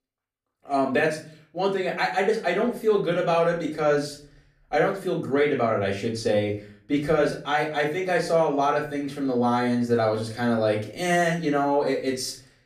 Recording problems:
off-mic speech; far
room echo; slight; dies away in 0.4 s

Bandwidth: 14.5 kHz